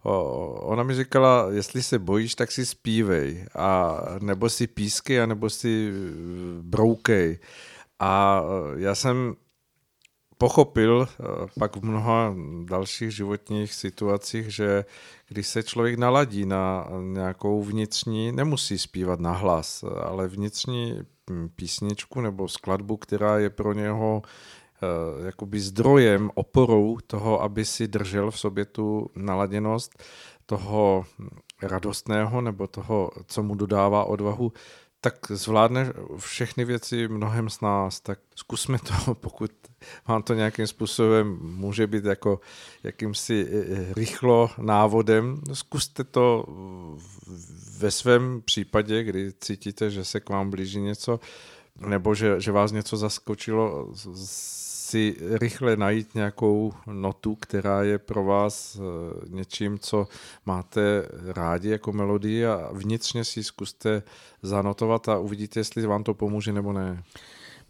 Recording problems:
none

